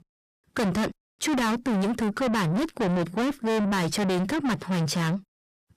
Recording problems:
distortion; heavy; 6 dB below the speech

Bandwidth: 14.5 kHz